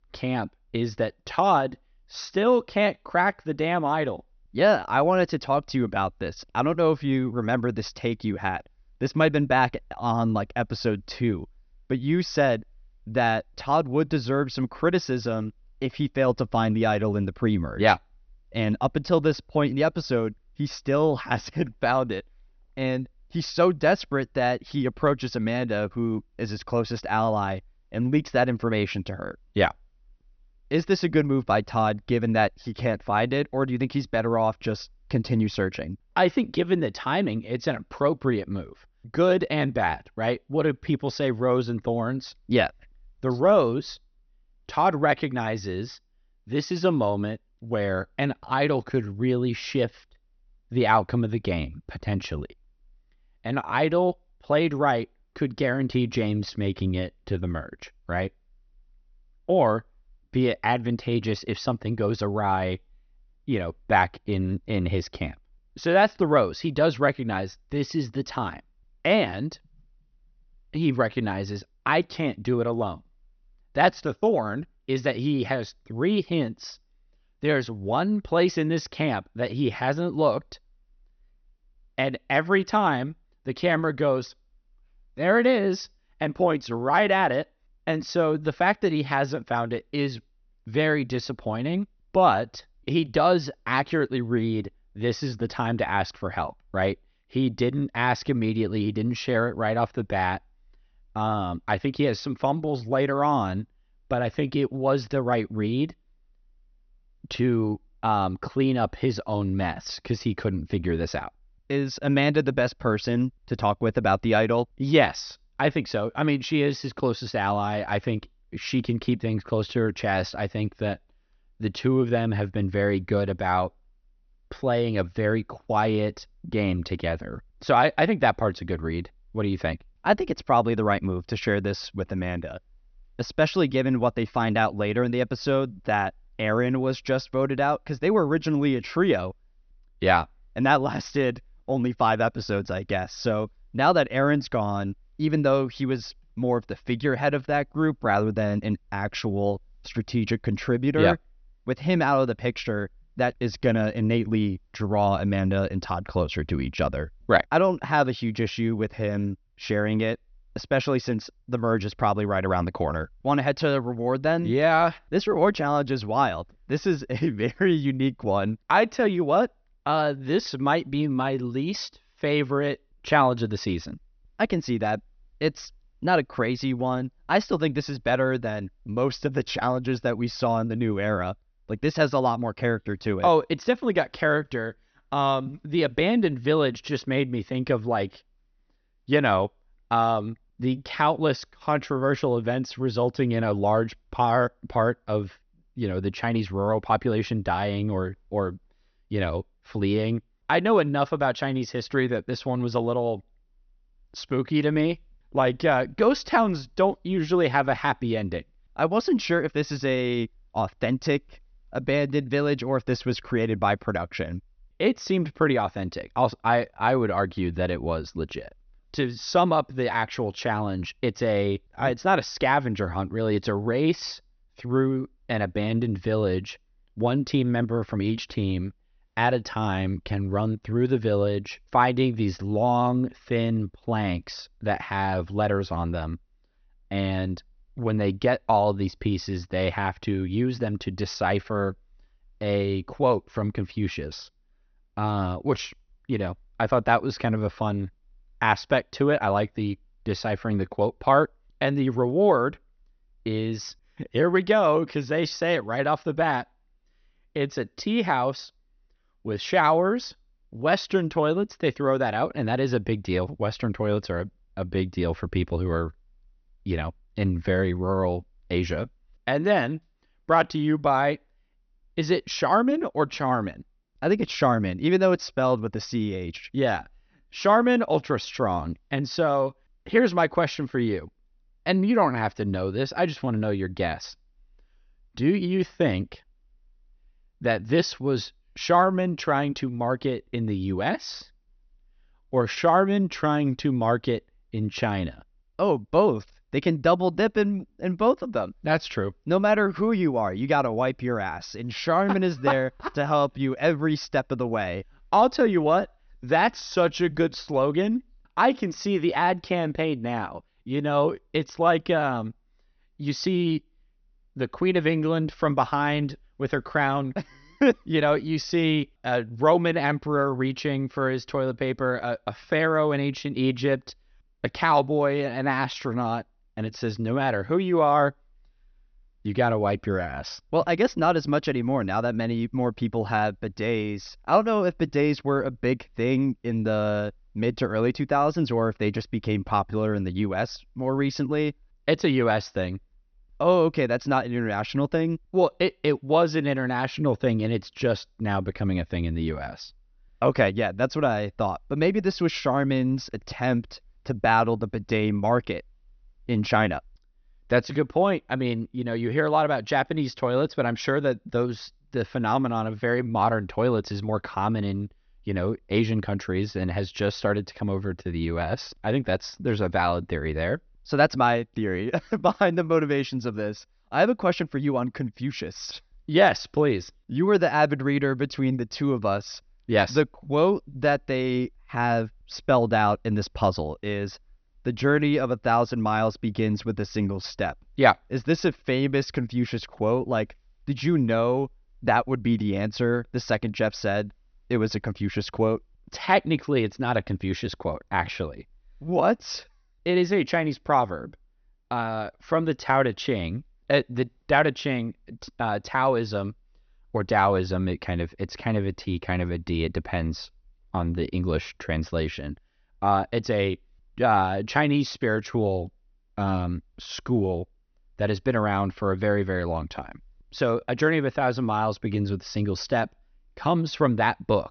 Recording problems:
high frequencies cut off; noticeable; nothing above 6 kHz

